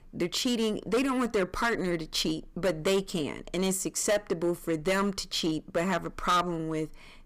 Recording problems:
distortion; heavy; 8% of the sound clipped

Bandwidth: 15 kHz